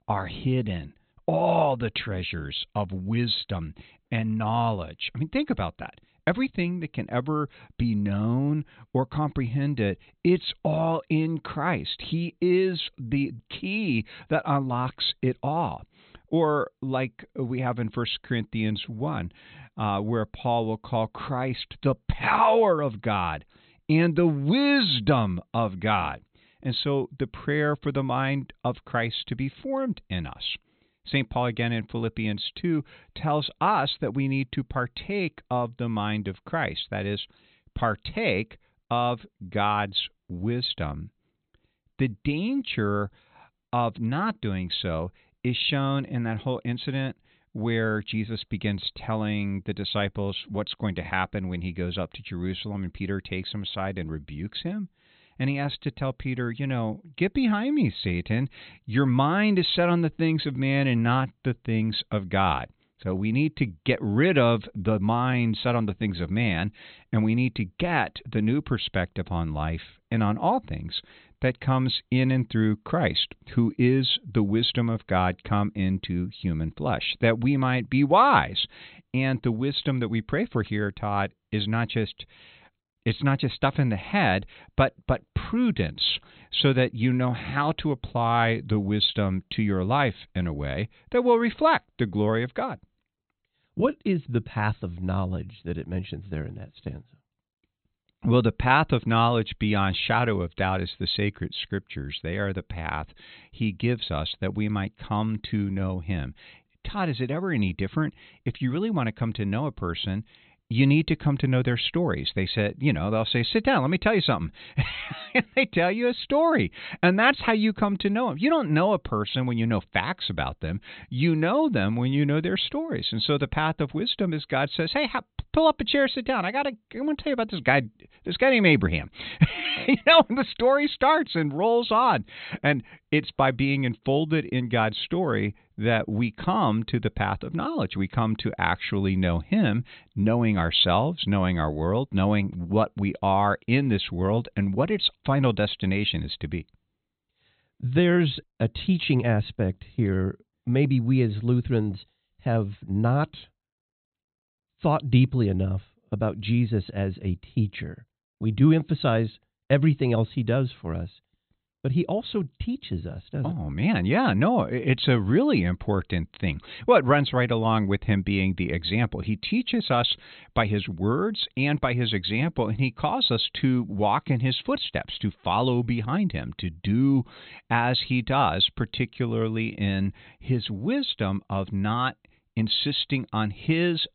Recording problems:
high frequencies cut off; severe; nothing above 4 kHz

